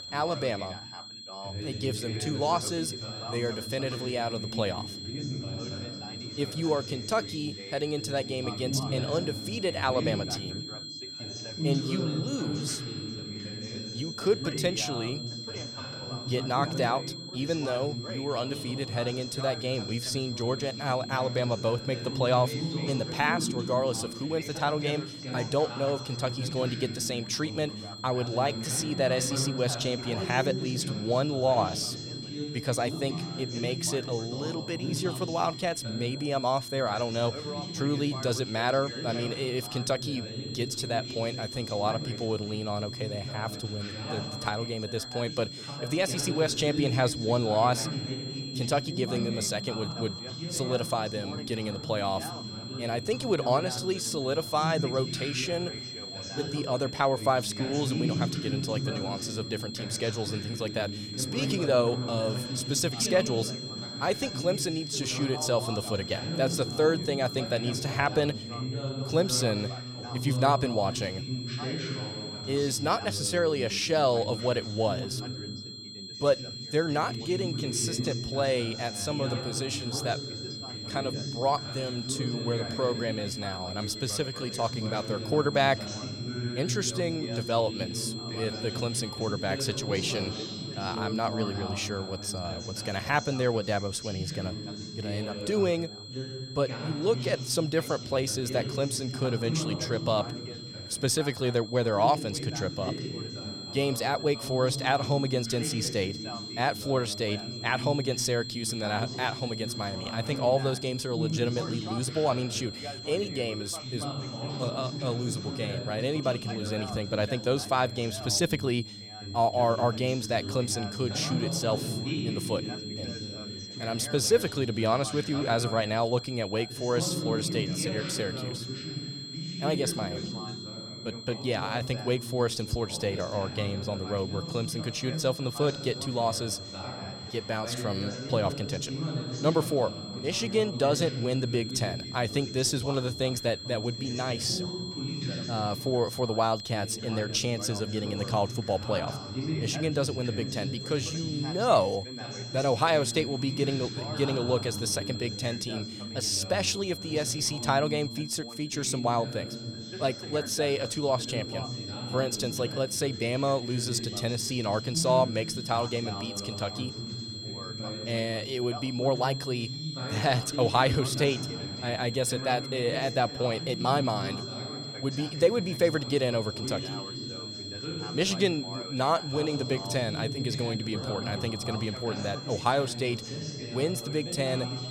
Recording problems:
high-pitched whine; loud; throughout; 4 kHz, 9 dB below the speech
background chatter; loud; throughout; 2 voices, 8 dB below the speech

